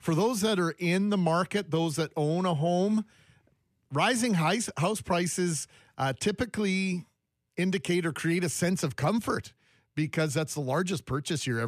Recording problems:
abrupt cut into speech; at the end

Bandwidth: 14.5 kHz